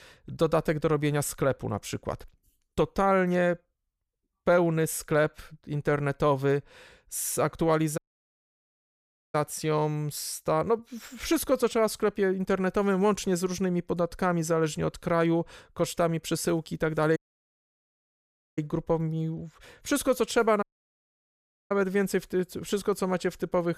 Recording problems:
audio cutting out; at 8 s for 1.5 s, at 17 s for 1.5 s and at 21 s for 1 s

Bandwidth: 15 kHz